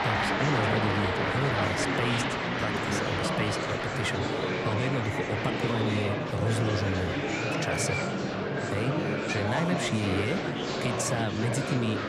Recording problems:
murmuring crowd; very loud; throughout; 2 dB above the speech

